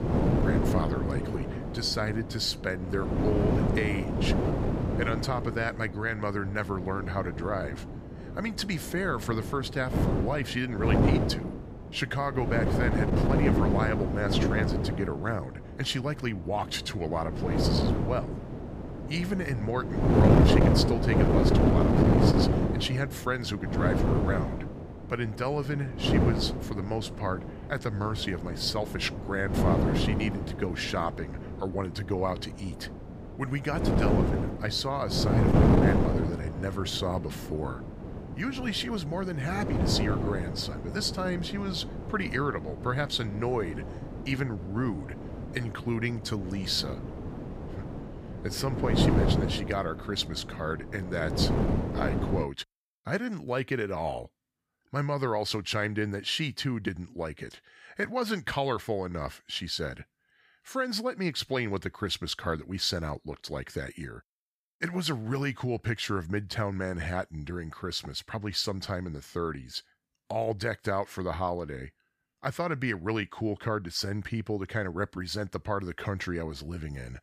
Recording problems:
wind noise on the microphone; heavy; until 52 s; 1 dB below the speech

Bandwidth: 15 kHz